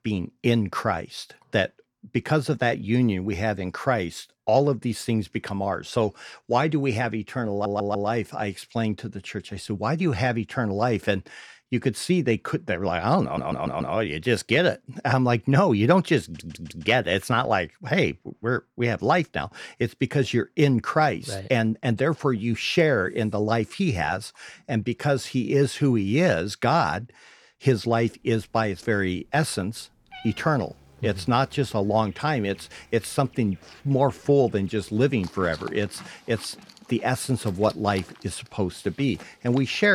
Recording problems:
animal sounds; faint; from 28 s on; 25 dB below the speech
audio stuttering; at 7.5 s, at 13 s and at 16 s
abrupt cut into speech; at the end

